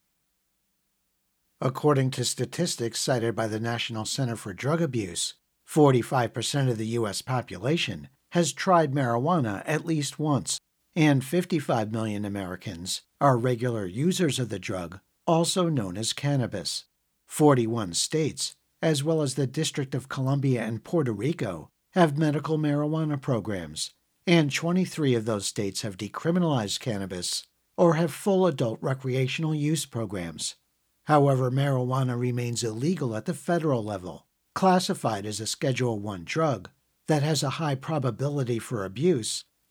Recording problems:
none

